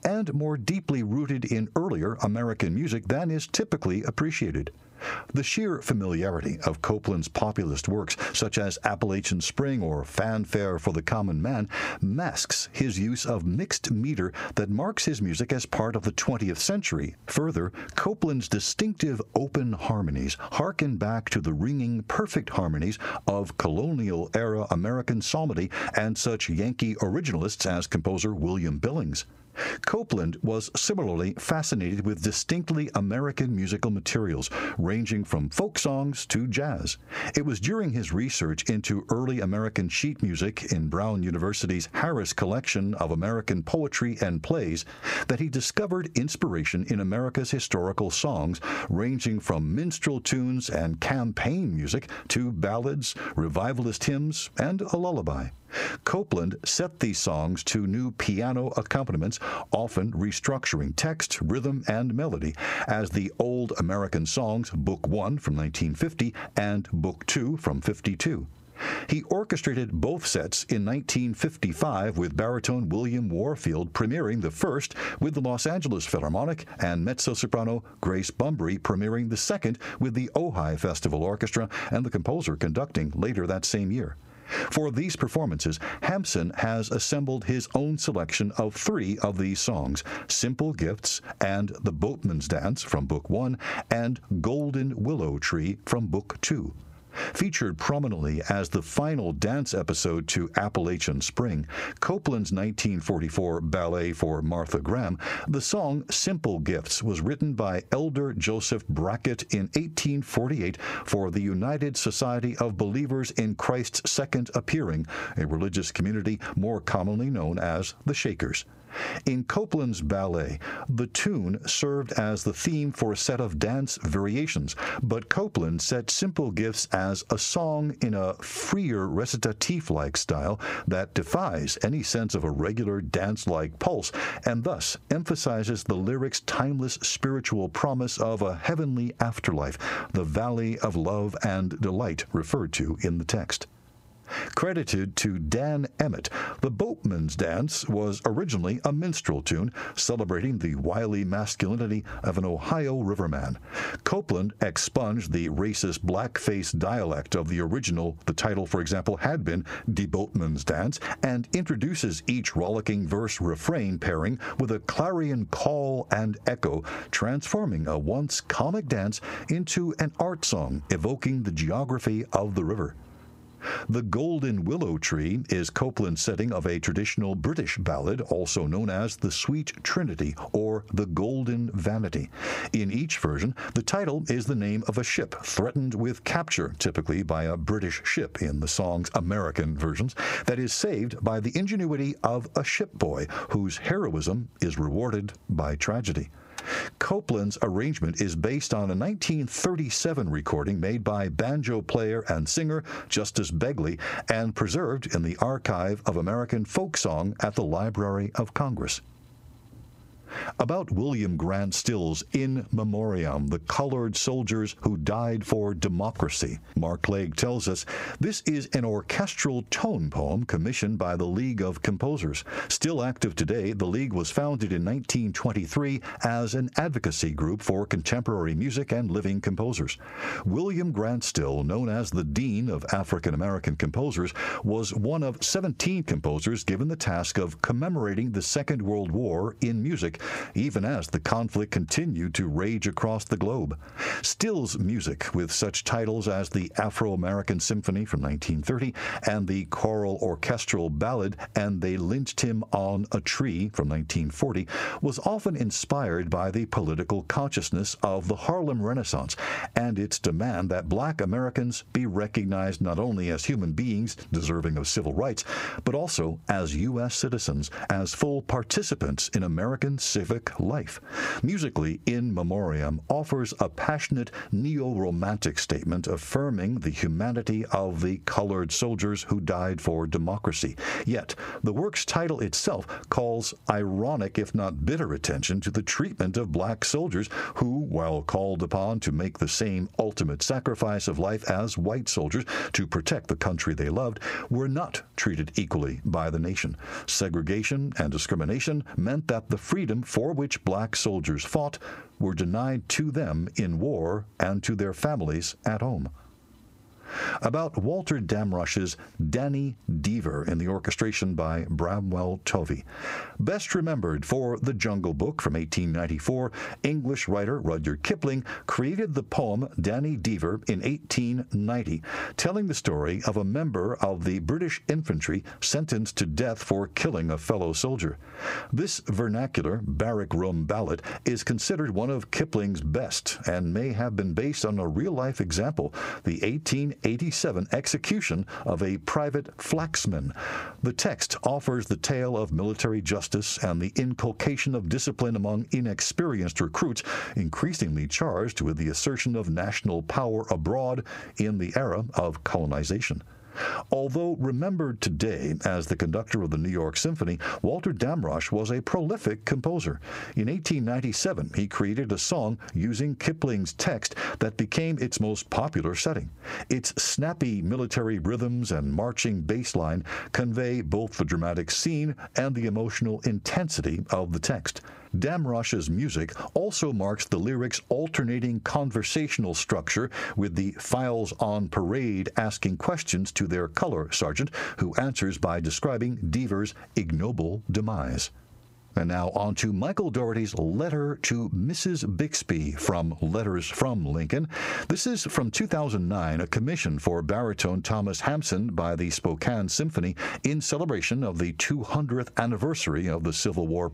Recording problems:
squashed, flat; heavily

